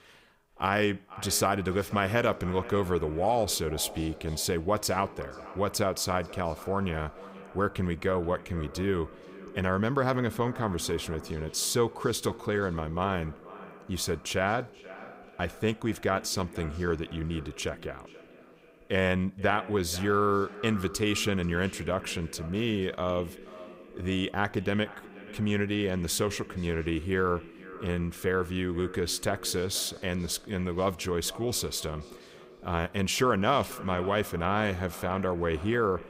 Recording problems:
echo of what is said; noticeable; throughout; 480 ms later, 15 dB below the speech

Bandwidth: 15.5 kHz